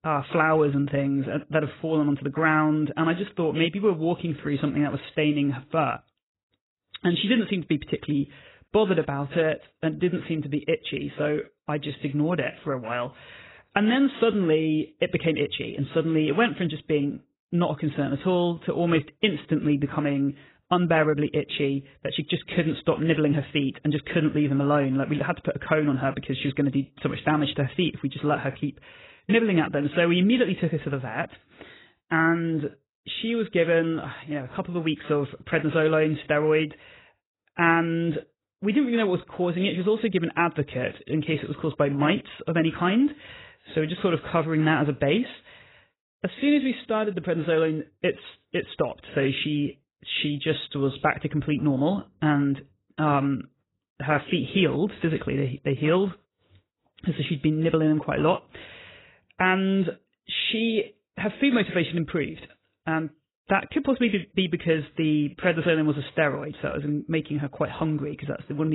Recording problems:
garbled, watery; badly; nothing above 4 kHz
abrupt cut into speech; at the end

